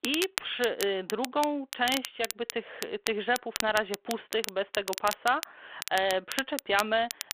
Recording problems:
phone-call audio
crackle, like an old record; loud; 8 dB below the speech

